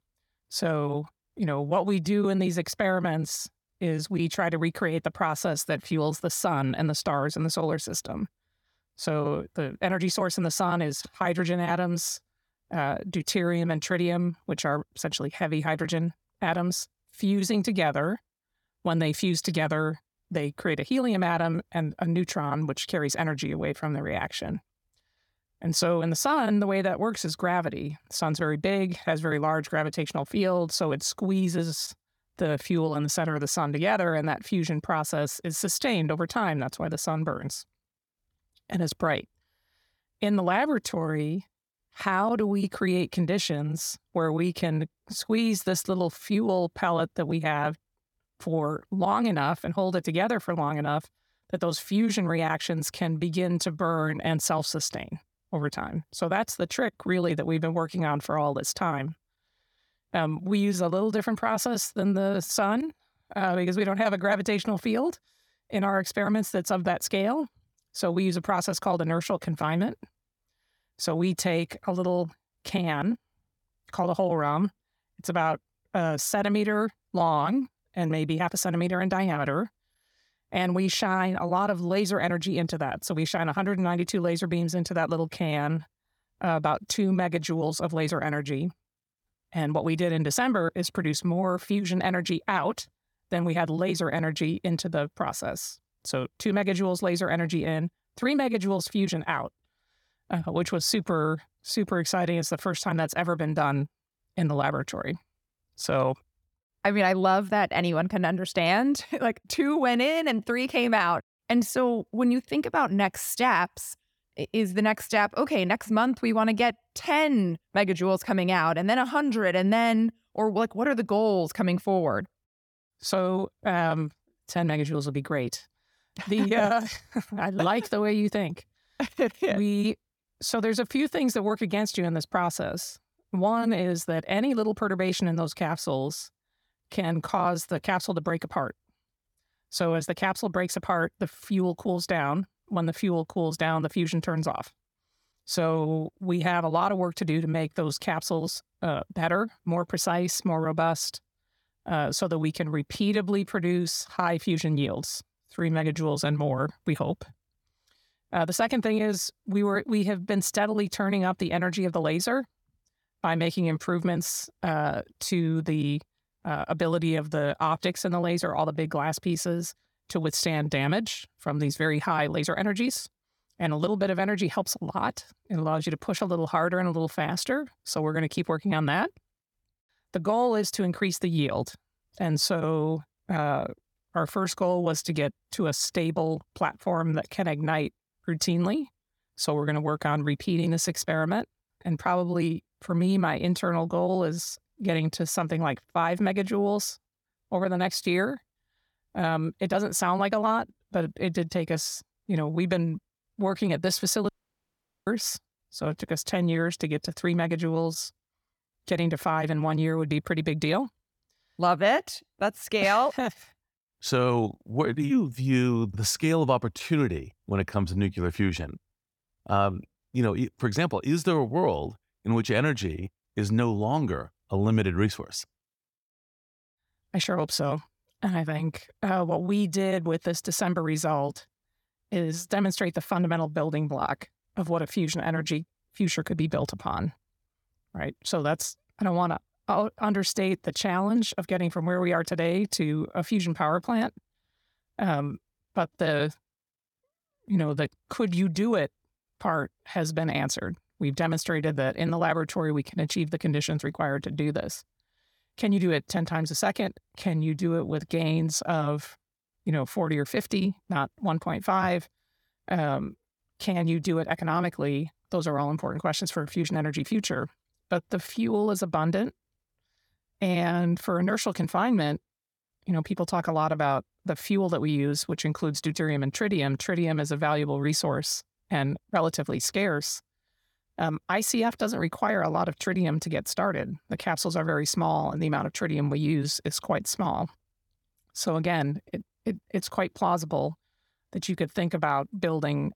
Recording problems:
audio cutting out; at 3:24 for 1 s

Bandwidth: 18 kHz